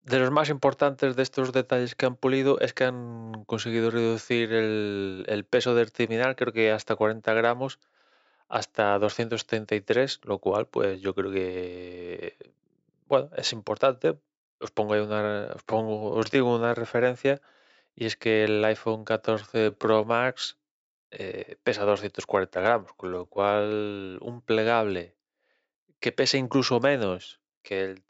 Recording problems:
high frequencies cut off; noticeable; nothing above 8 kHz
uneven, jittery; strongly; from 16 to 24 s

